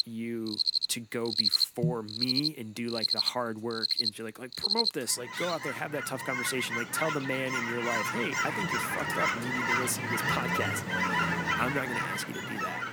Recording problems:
animal sounds; very loud; throughout; 5 dB above the speech

